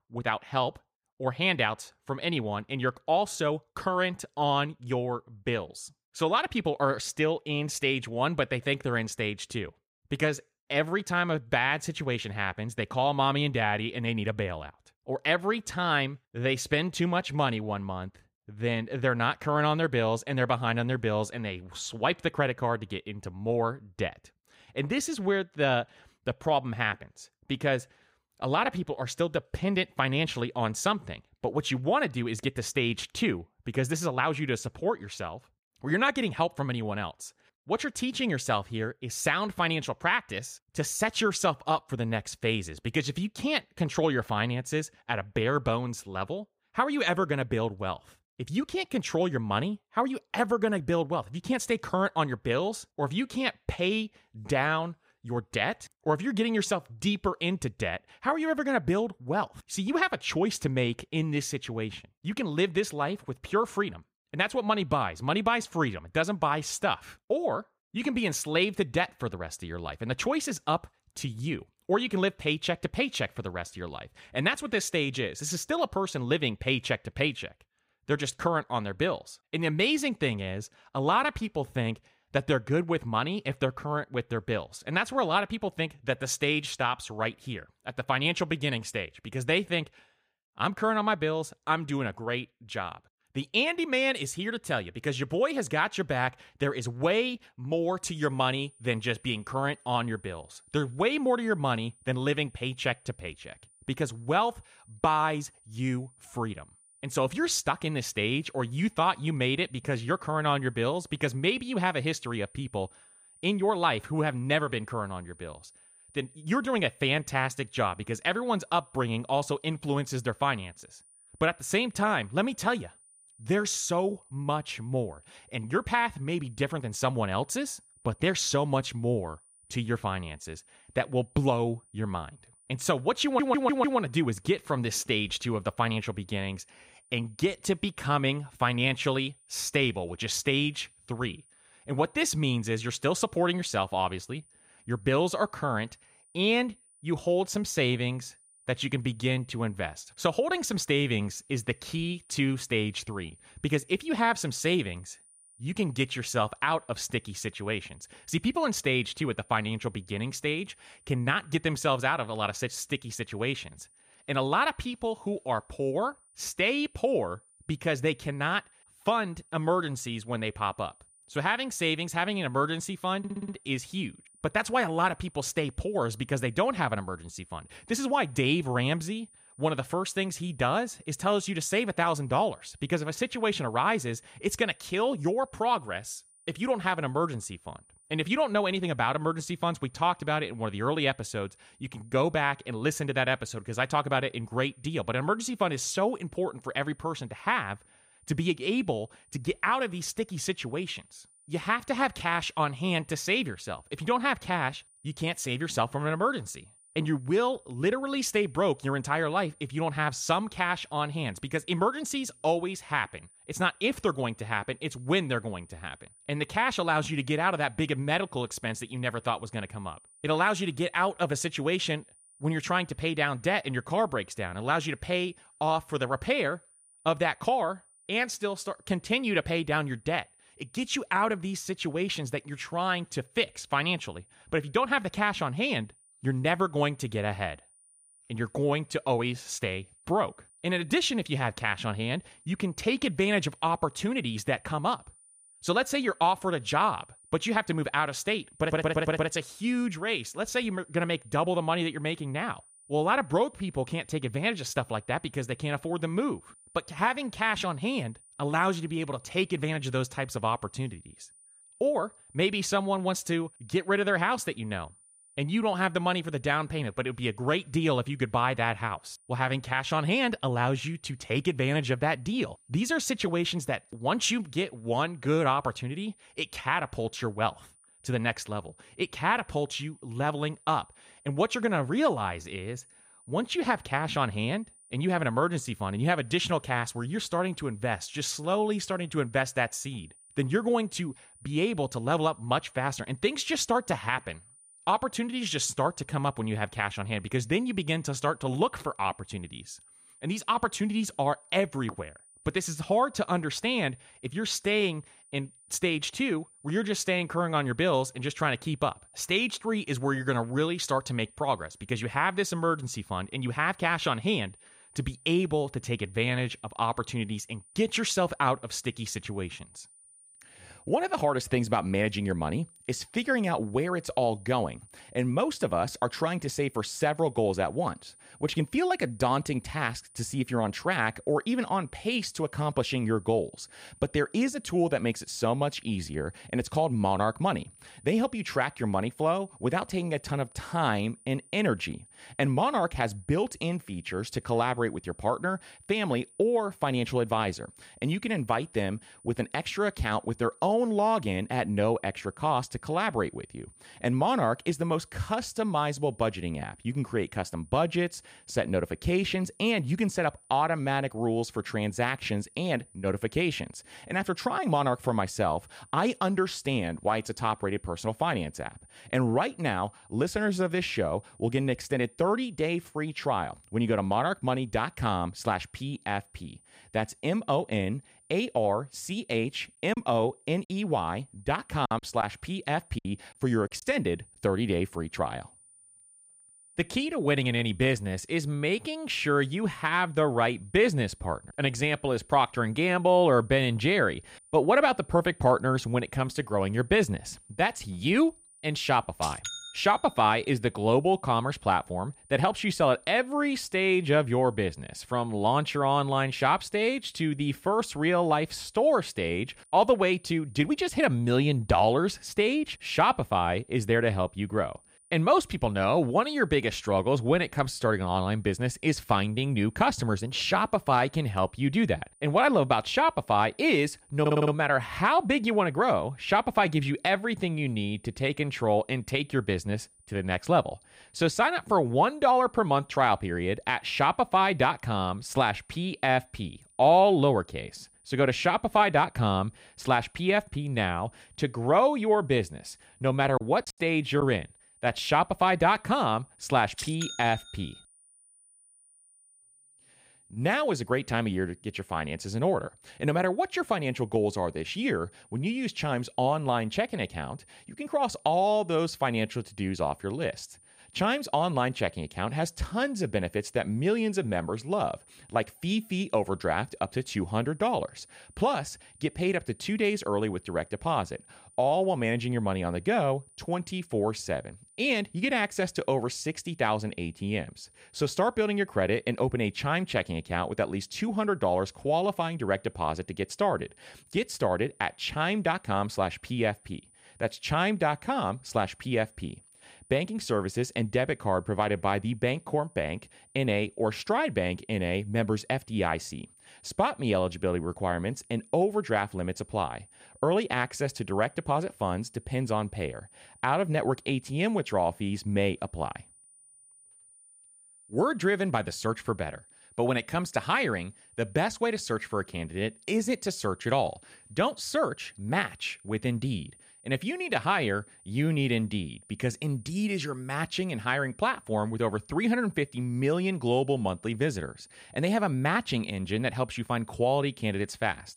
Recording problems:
high-pitched whine; faint; from 1:38 on; 9.5 kHz, 25 dB below the speech
audio stuttering; 4 times, first at 2:13
choppy; very; from 6:20 to 6:24 and at 7:23; 7% of the speech affected

